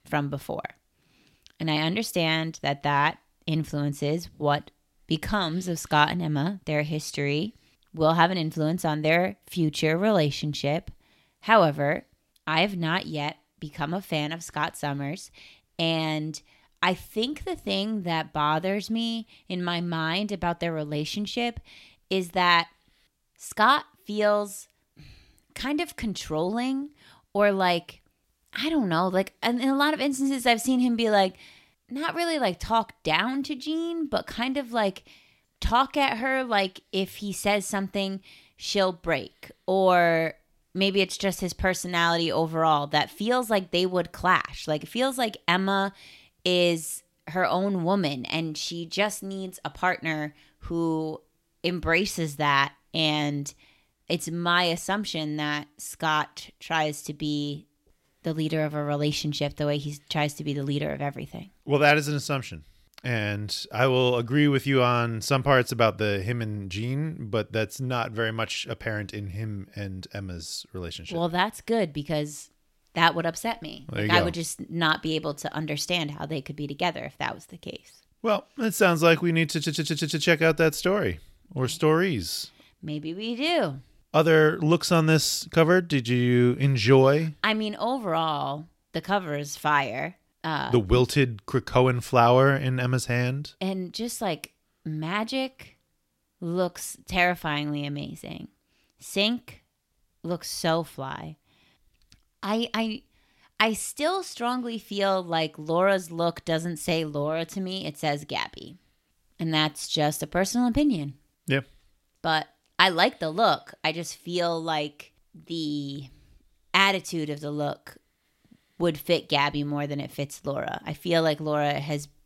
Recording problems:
audio stuttering; at 1:20

